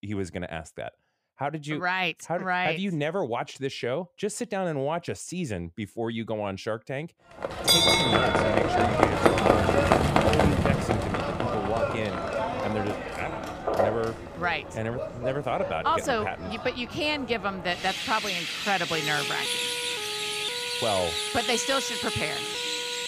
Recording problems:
animal sounds; very loud; from 7.5 s on; 4 dB above the speech
siren; noticeable; from 19 s on; peak 6 dB below the speech

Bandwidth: 15 kHz